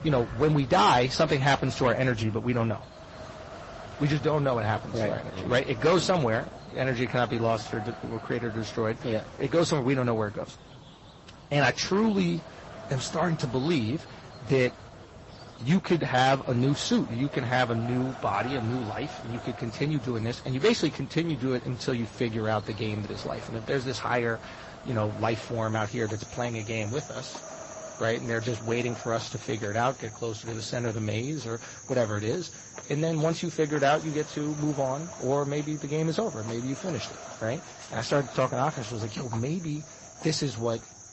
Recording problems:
distortion; slight; 2% of the sound clipped
garbled, watery; slightly; nothing above 8 kHz
high frequencies cut off; slight
animal sounds; noticeable; throughout; 20 dB below the speech
wind noise on the microphone; occasional gusts; 15 dB below the speech

